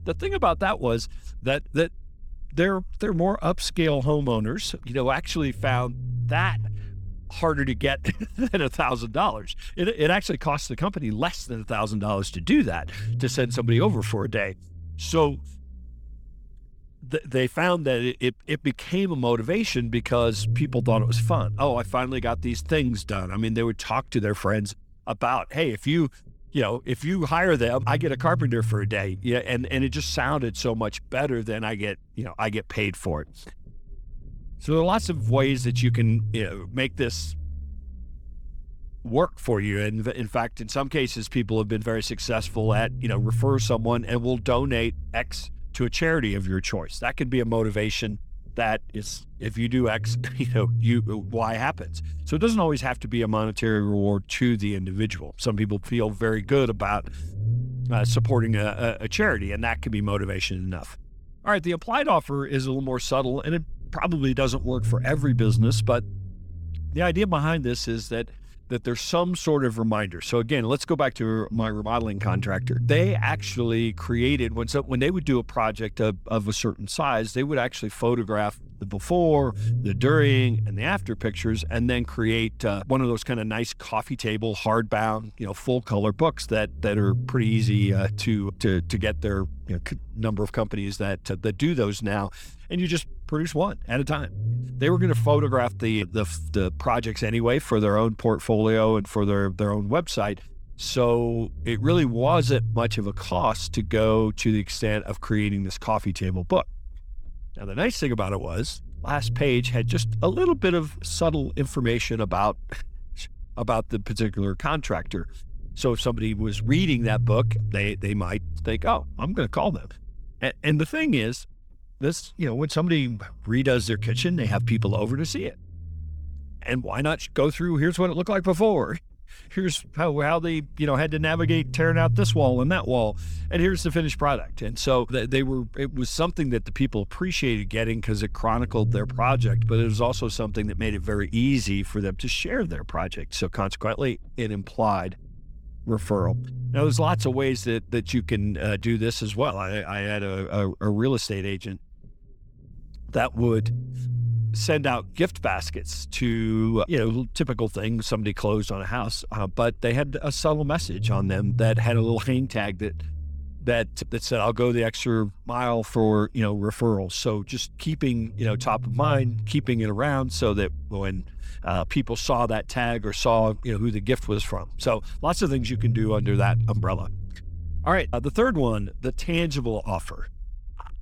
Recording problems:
low rumble; noticeable; throughout; 15 dB below the speech

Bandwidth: 18.5 kHz